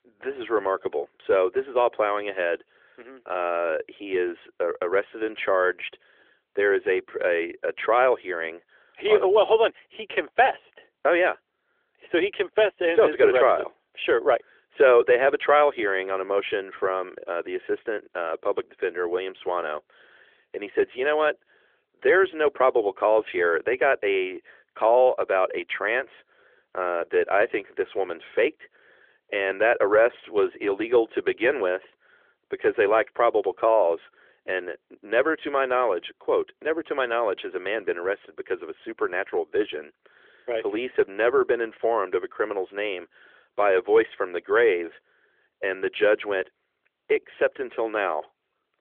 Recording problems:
phone-call audio; nothing above 3.5 kHz

